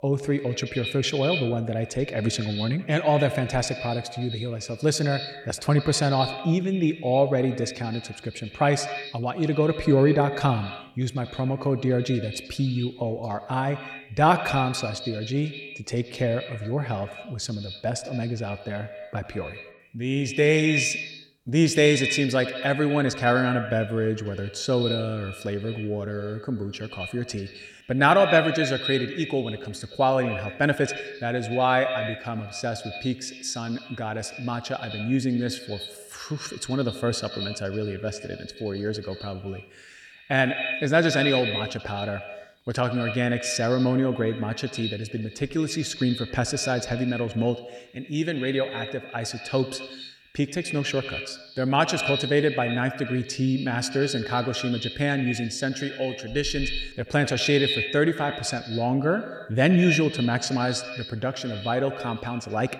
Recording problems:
echo of what is said; strong; throughout; 80 ms later, 8 dB below the speech

